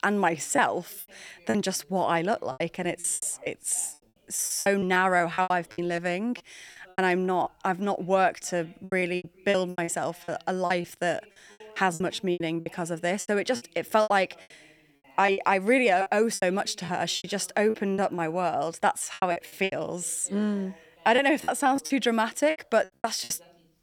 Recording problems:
voice in the background; faint; throughout; 30 dB below the speech
choppy; very; 14% of the speech affected

